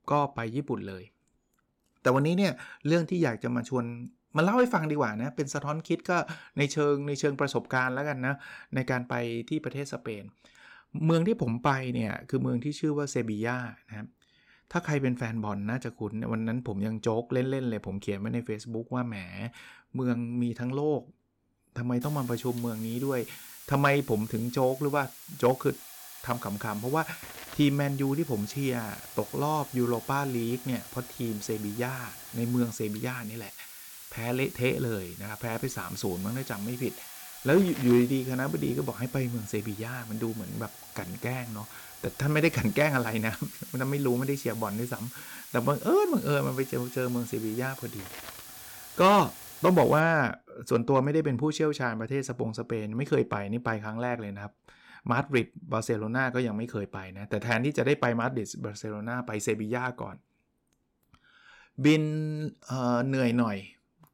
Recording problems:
hiss; noticeable; from 22 to 50 s; 15 dB below the speech

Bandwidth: 17.5 kHz